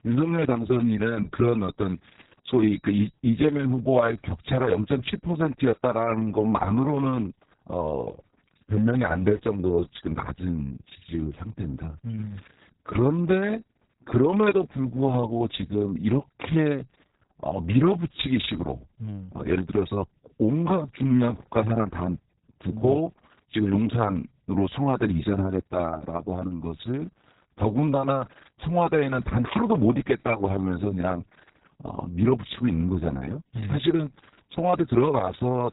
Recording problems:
garbled, watery; badly
high frequencies cut off; severe; nothing above 4 kHz

